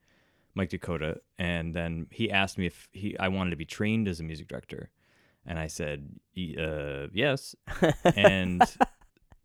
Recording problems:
none

